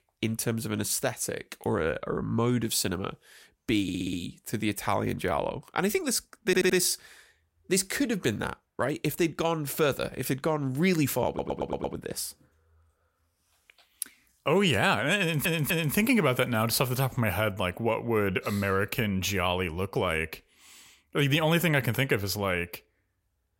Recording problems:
audio stuttering; 4 times, first at 4 s

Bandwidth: 16 kHz